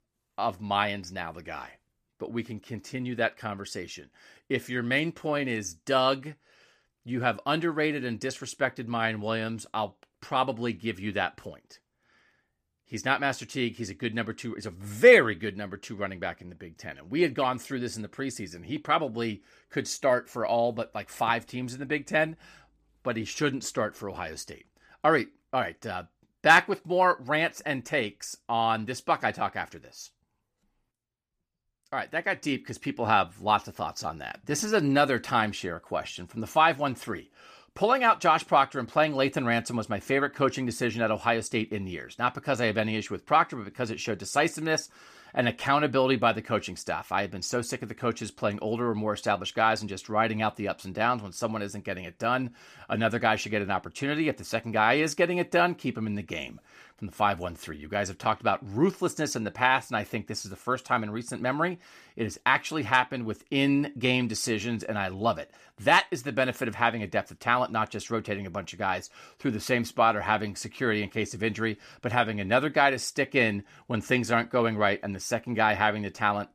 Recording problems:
none

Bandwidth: 14.5 kHz